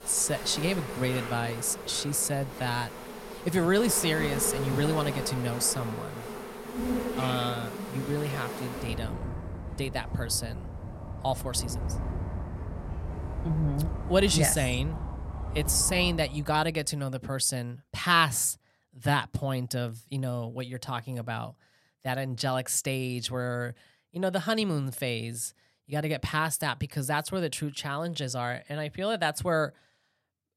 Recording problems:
animal sounds; loud; until 16 s; 7 dB below the speech

